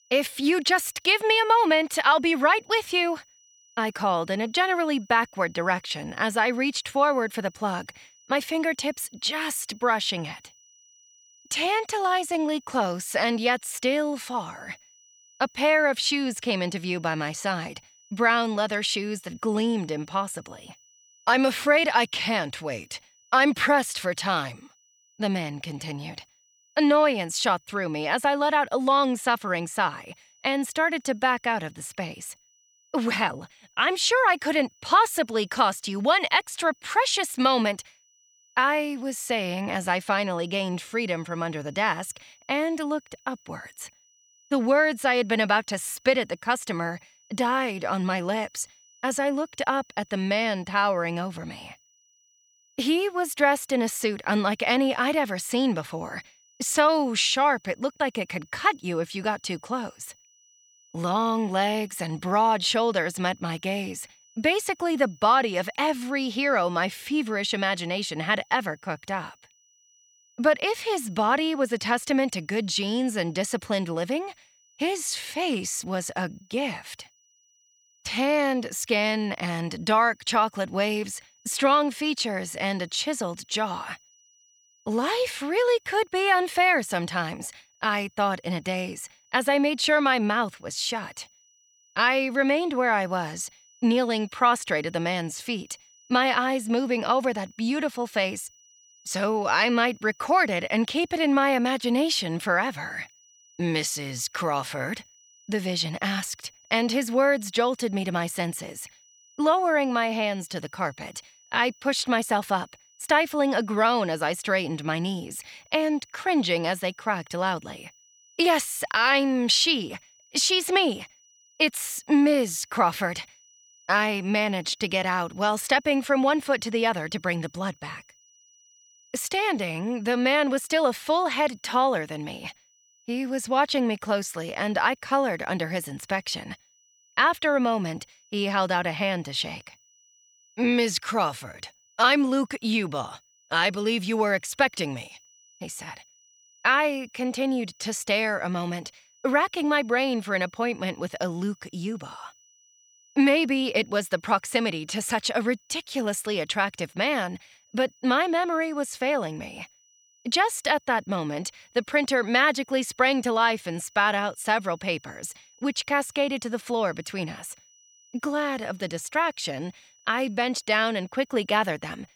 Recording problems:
high-pitched whine; faint; throughout; 6 kHz, 30 dB below the speech

